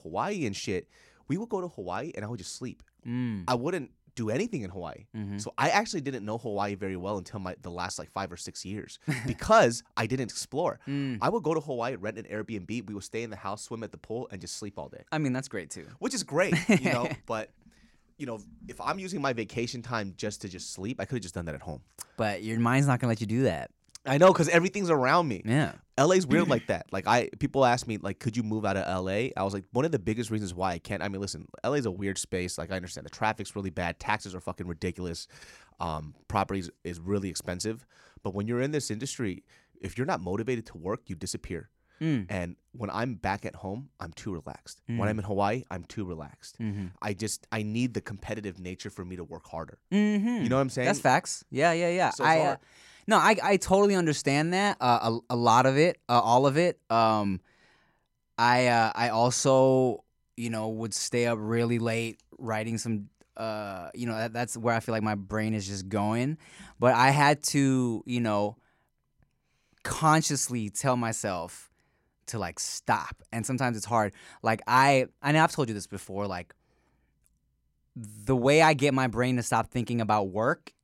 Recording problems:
none

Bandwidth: 16 kHz